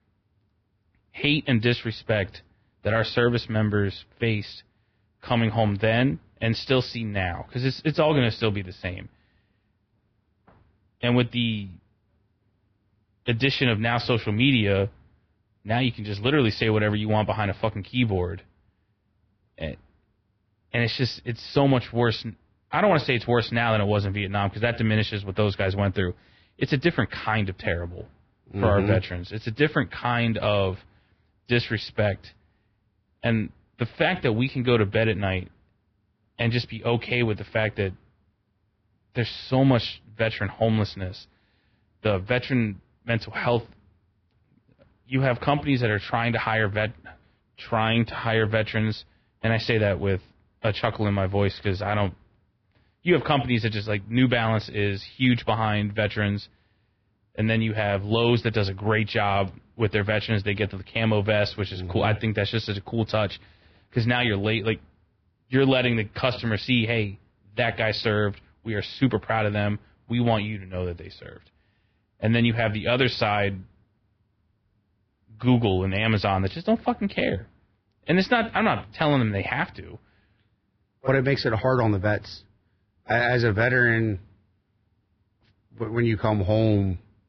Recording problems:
garbled, watery; badly; nothing above 5 kHz

